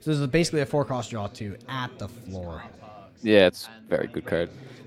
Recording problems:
background chatter; faint; throughout; 4 voices, 20 dB below the speech

